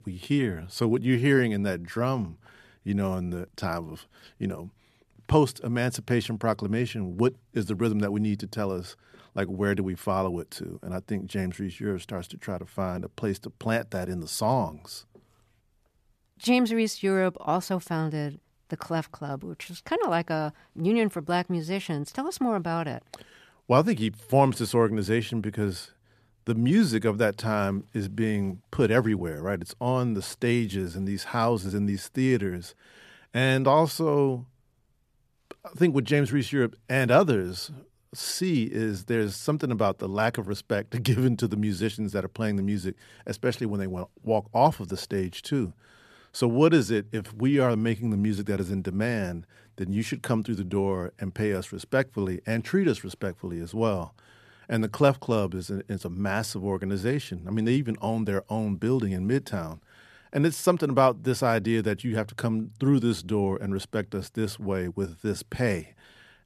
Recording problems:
none

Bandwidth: 14.5 kHz